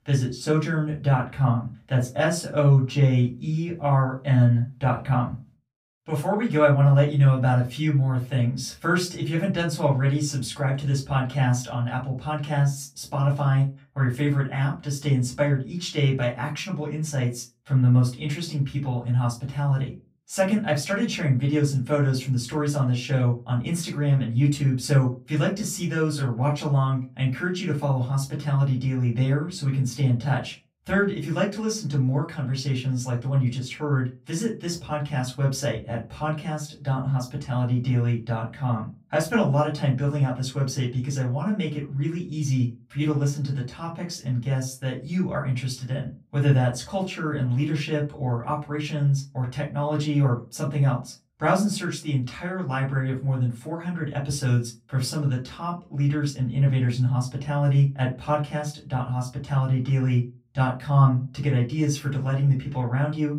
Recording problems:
off-mic speech; far
room echo; very slight; dies away in 0.2 s

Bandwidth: 15.5 kHz